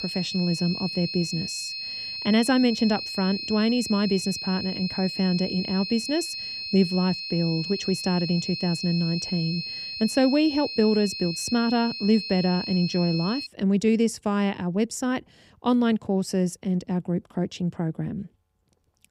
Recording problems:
high-pitched whine; loud; until 13 s; 4 kHz, 6 dB below the speech

